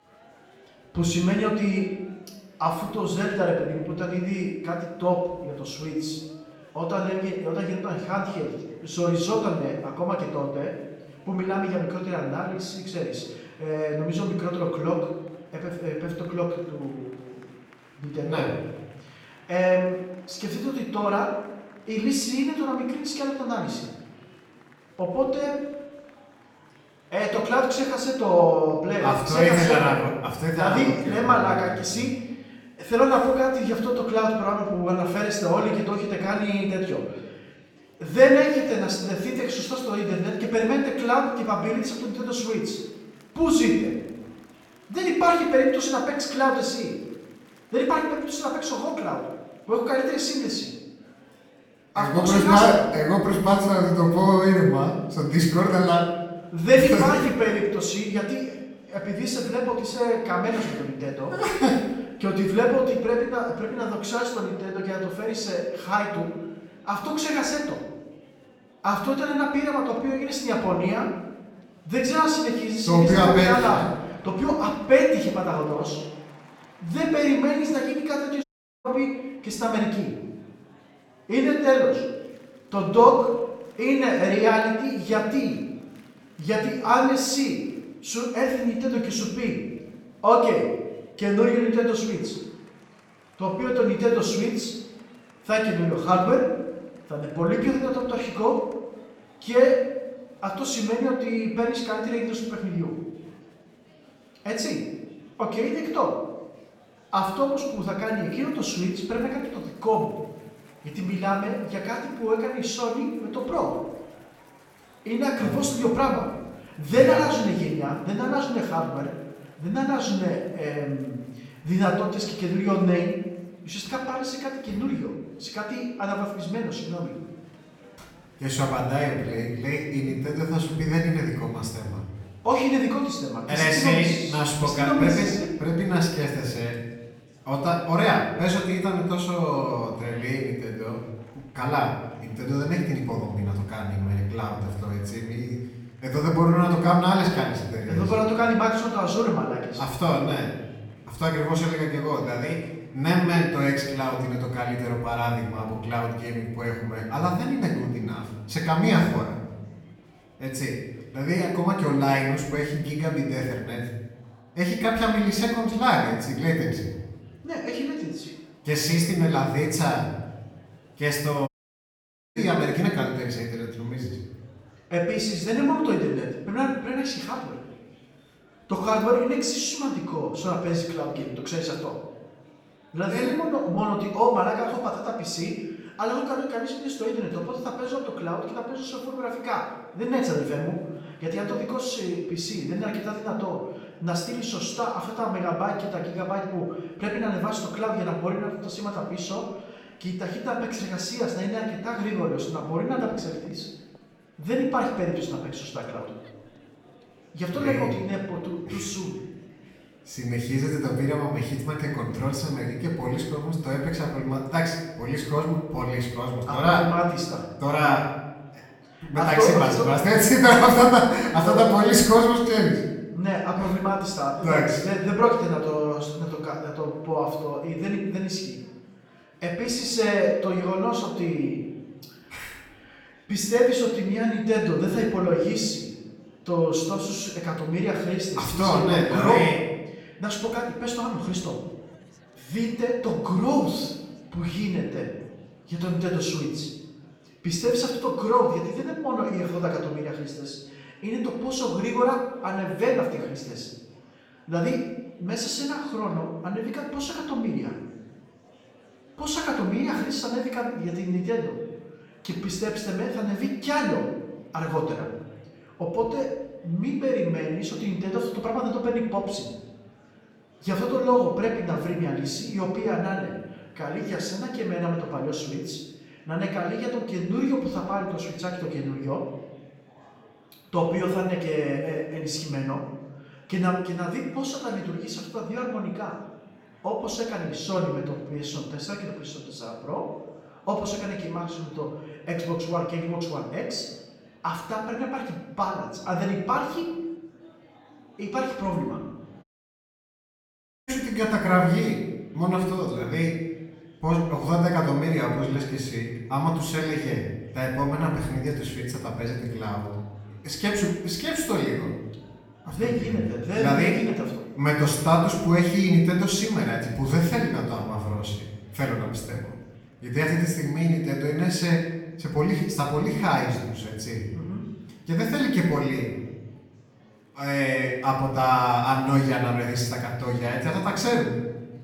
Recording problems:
off-mic speech; far
room echo; noticeable; dies away in 0.9 s
murmuring crowd; faint; throughout; 30 dB below the speech
audio cutting out; at 1:18, at 2:51 for 1 s and at 4:59 for 1.5 s

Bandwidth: 17.5 kHz